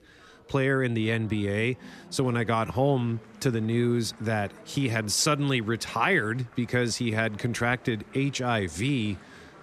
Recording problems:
murmuring crowd; faint; throughout; 25 dB below the speech

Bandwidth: 13.5 kHz